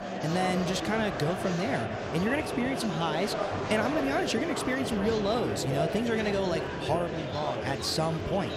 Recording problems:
murmuring crowd; loud; throughout; 3 dB below the speech

